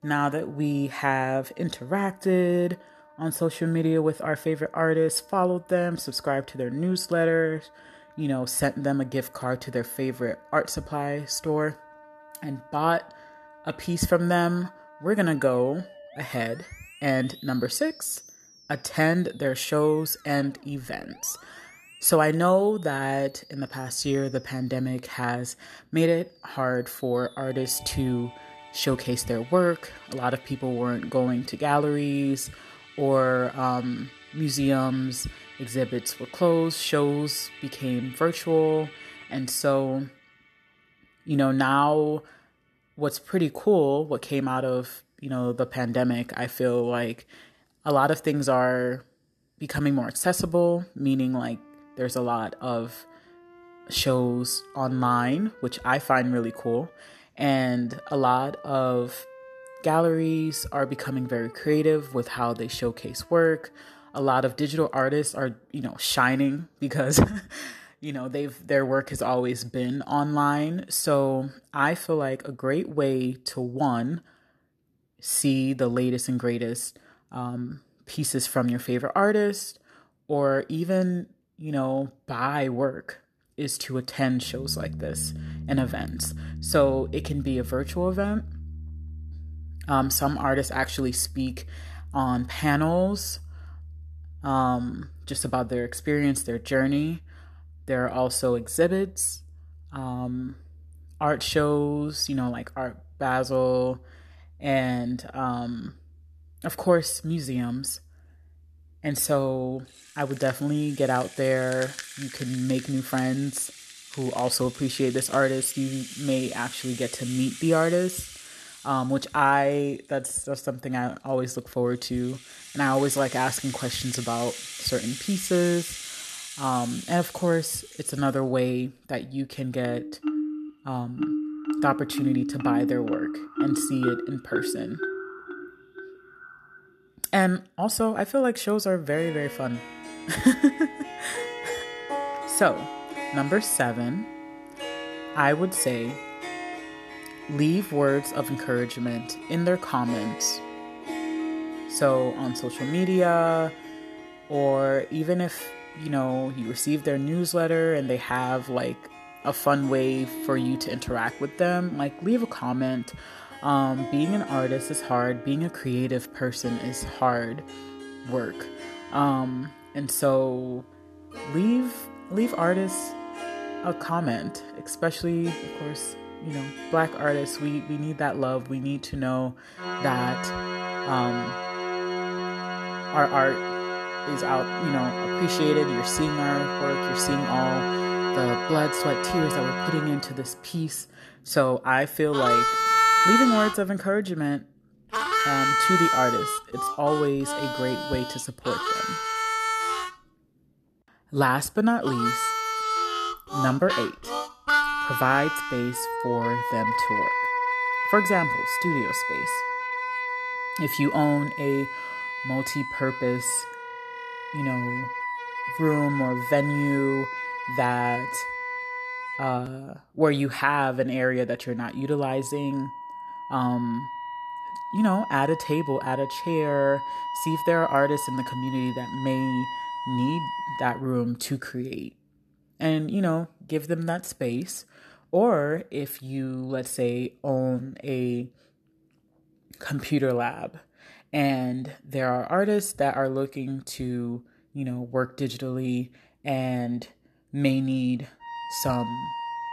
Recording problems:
background music; loud; throughout; 5 dB below the speech

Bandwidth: 13.5 kHz